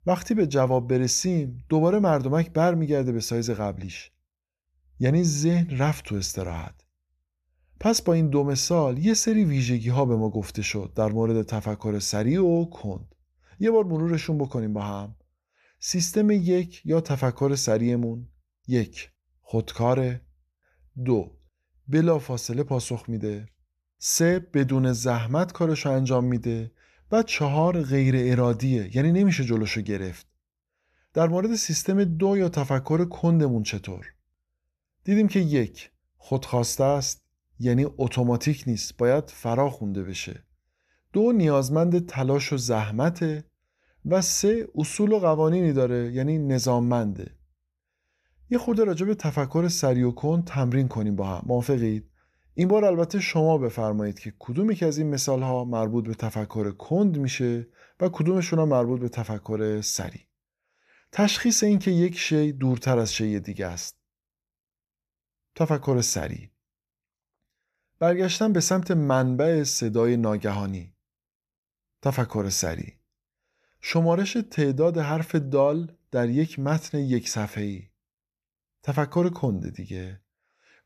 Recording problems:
none

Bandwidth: 13.5 kHz